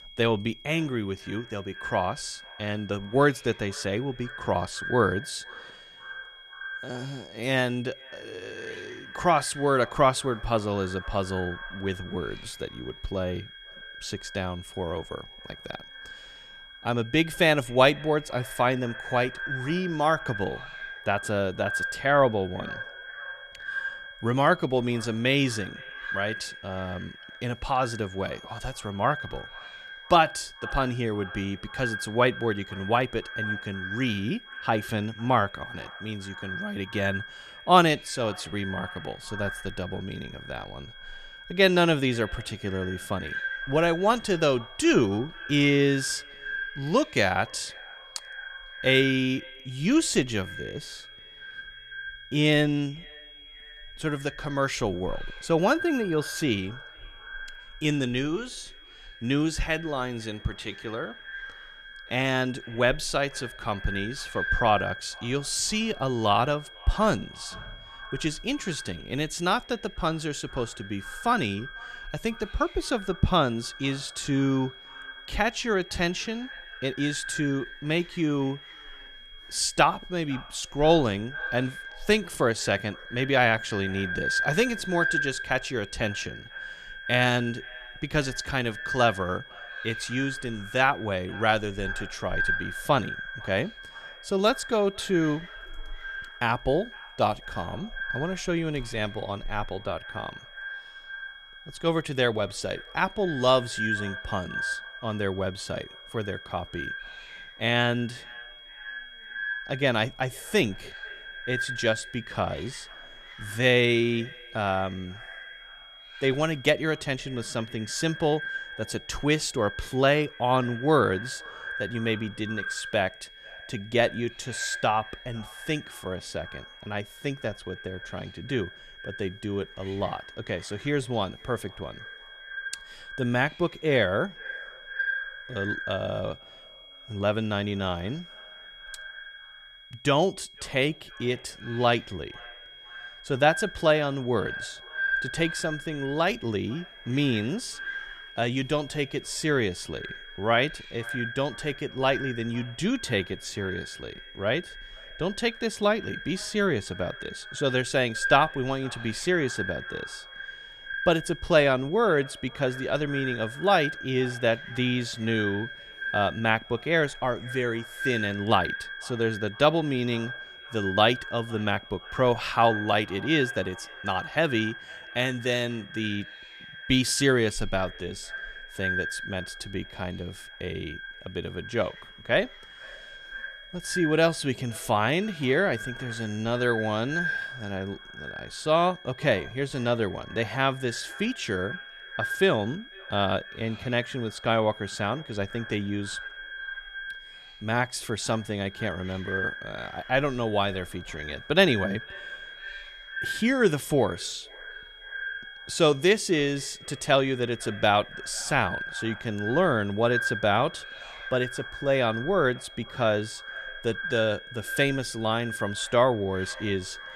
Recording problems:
echo of what is said; strong; throughout; 500 ms later, 10 dB below the speech
high-pitched whine; noticeable; throughout; 3.5 kHz, 20 dB below the speech
hiss; faint; throughout; 30 dB below the speech

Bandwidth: 14.5 kHz